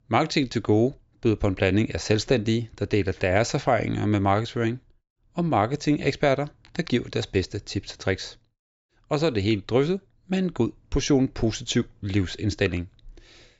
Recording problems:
high frequencies cut off; noticeable; nothing above 8 kHz

